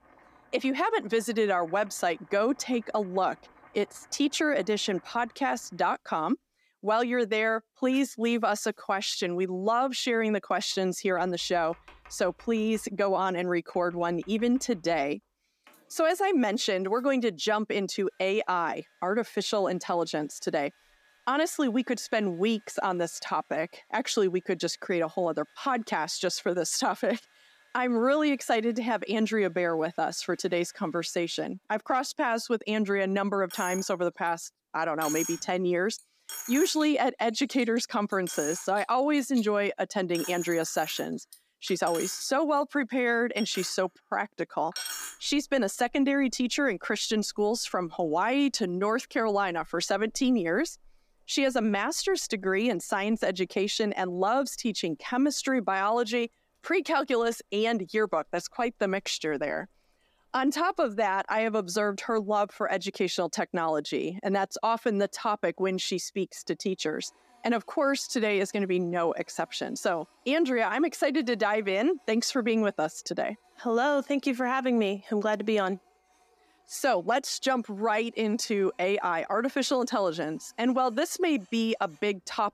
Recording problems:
household noises; noticeable; throughout; 15 dB below the speech

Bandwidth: 14.5 kHz